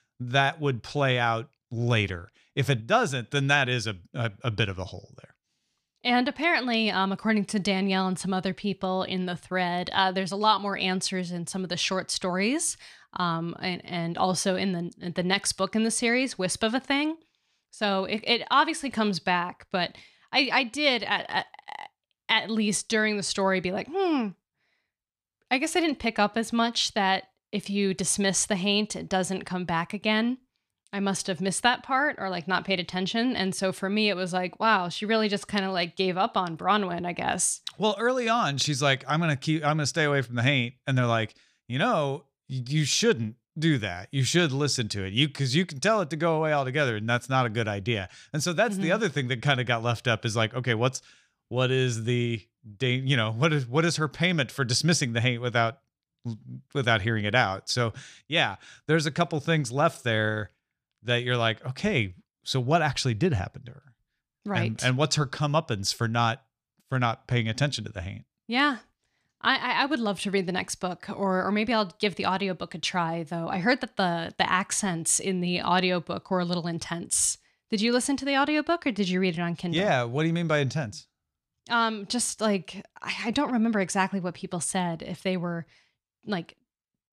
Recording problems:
none

